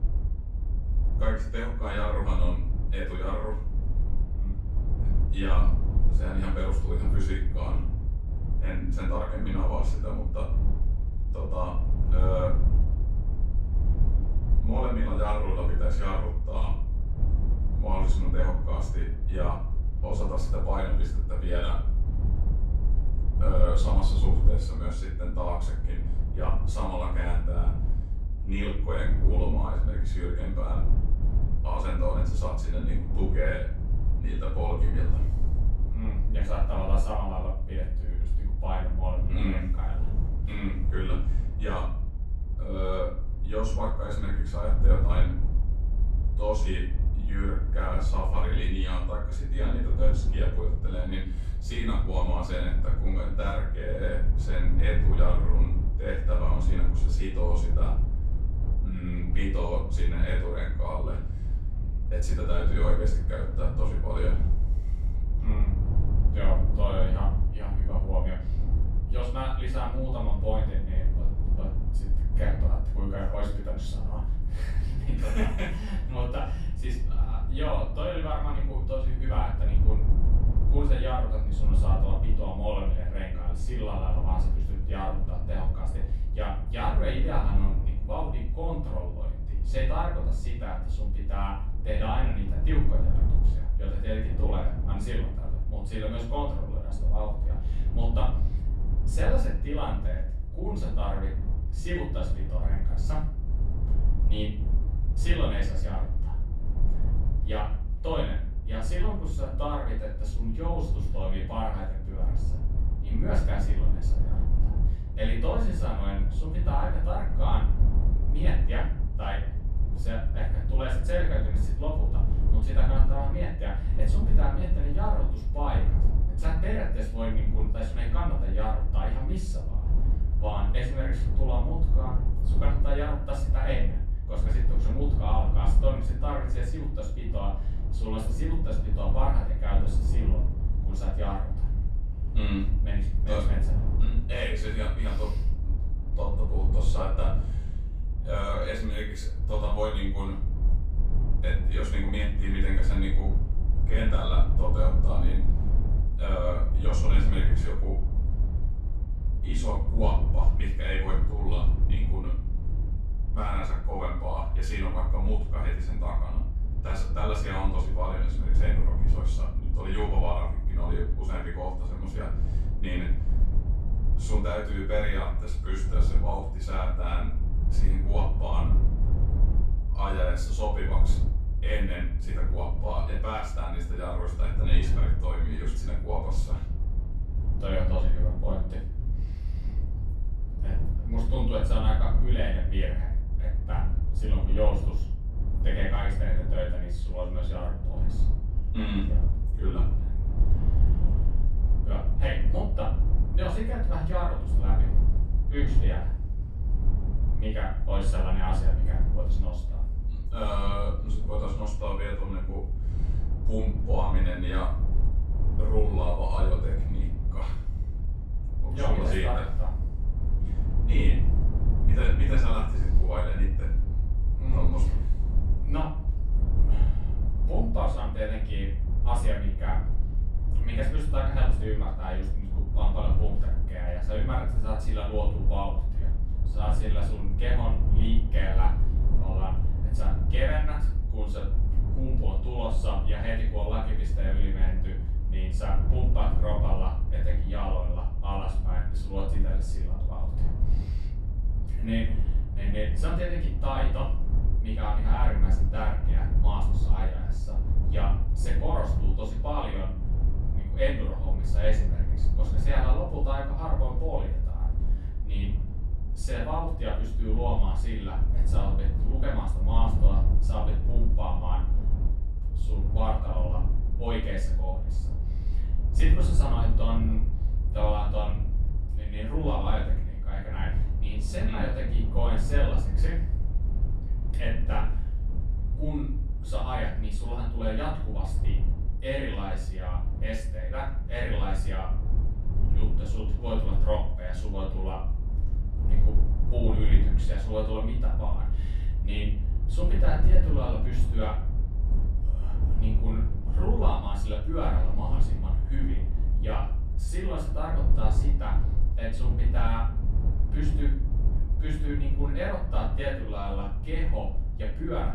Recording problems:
off-mic speech; far
room echo; noticeable; dies away in 0.5 s
wind noise on the microphone; occasional gusts; 20 dB below the speech
low rumble; noticeable; throughout; 10 dB below the speech

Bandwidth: 15 kHz